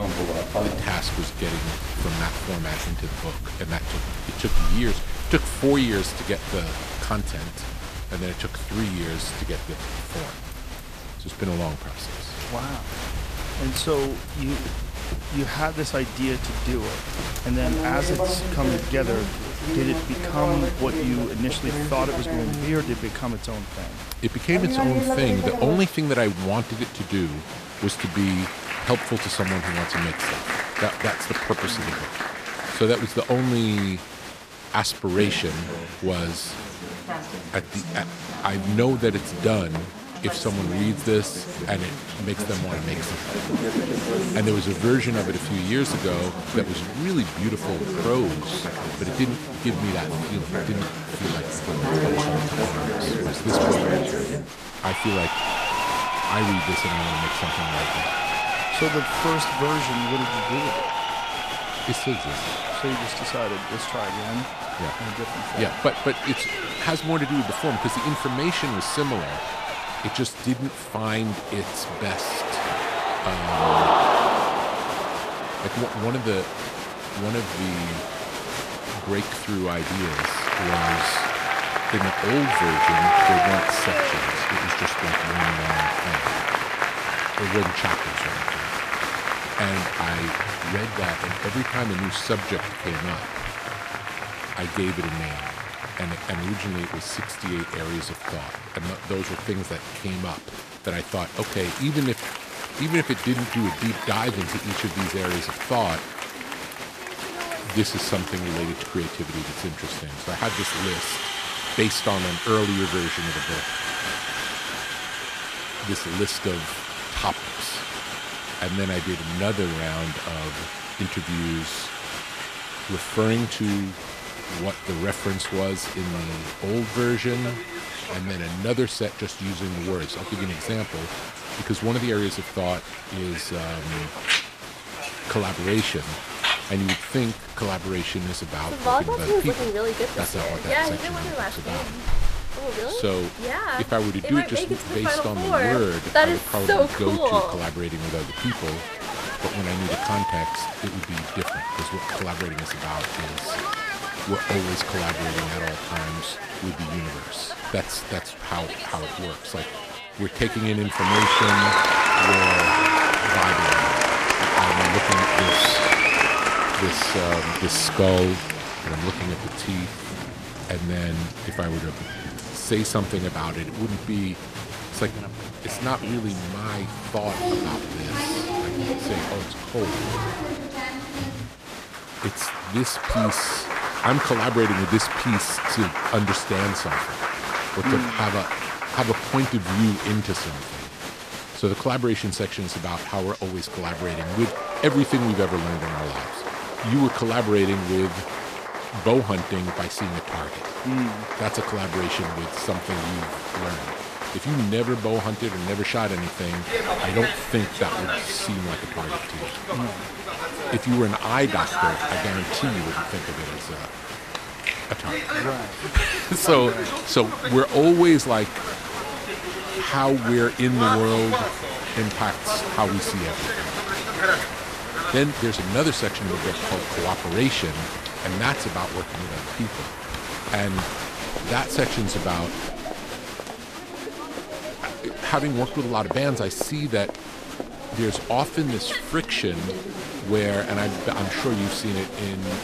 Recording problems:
crowd noise; loud; throughout; as loud as the speech

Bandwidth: 14.5 kHz